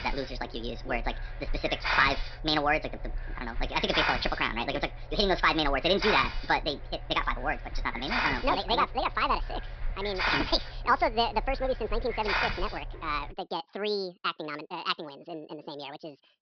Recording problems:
wrong speed and pitch; too fast and too high; 1.6 times normal speed
high frequencies cut off; noticeable; nothing above 5.5 kHz
hiss; loud; until 13 s; 5 dB below the speech

